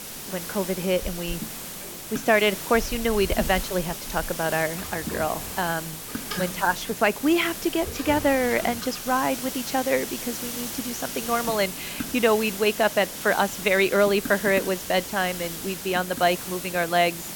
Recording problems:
high frequencies cut off; noticeable; nothing above 8 kHz
hiss; loud; throughout; 8 dB below the speech
household noises; noticeable; until 9 s; 15 dB below the speech

